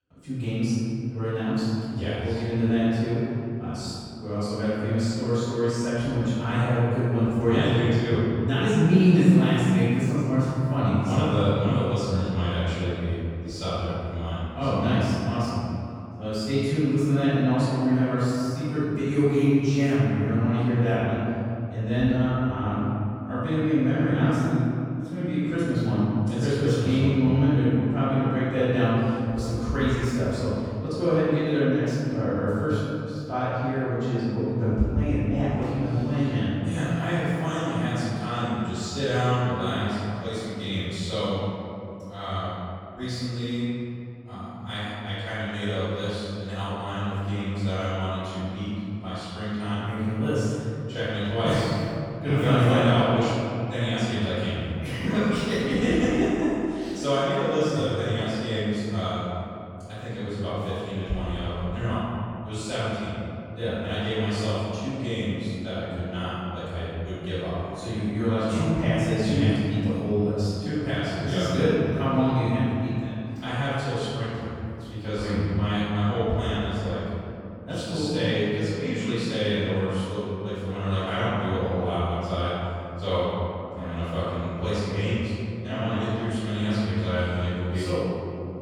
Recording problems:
room echo; strong; dies away in 2.7 s
off-mic speech; far

